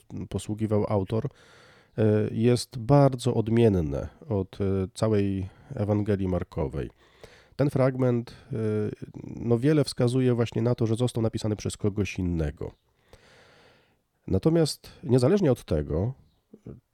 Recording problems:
uneven, jittery; strongly; from 2 to 16 s

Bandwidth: 18.5 kHz